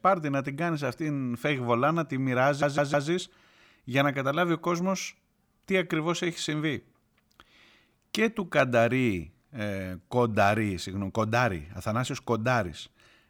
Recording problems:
audio stuttering; at 2.5 s

